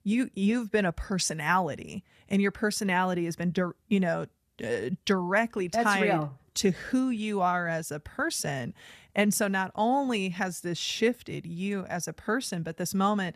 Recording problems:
none

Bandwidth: 14.5 kHz